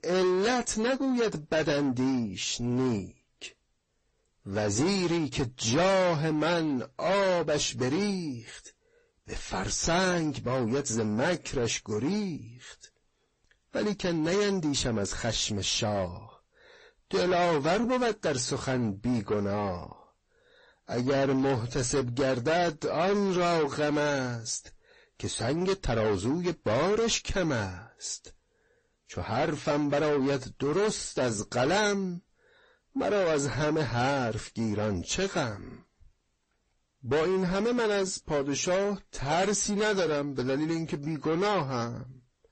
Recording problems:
distortion; heavy; 7 dB below the speech
garbled, watery; slightly; nothing above 8 kHz

